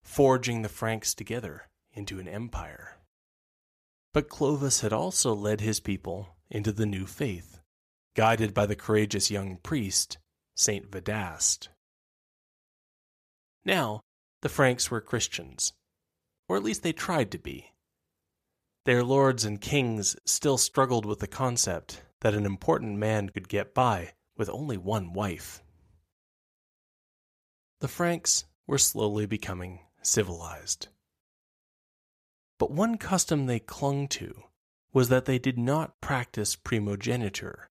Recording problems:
none

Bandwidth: 14.5 kHz